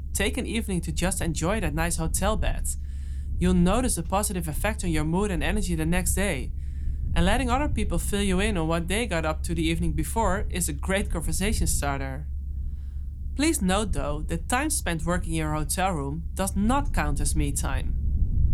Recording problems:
low rumble; faint; throughout; 20 dB below the speech

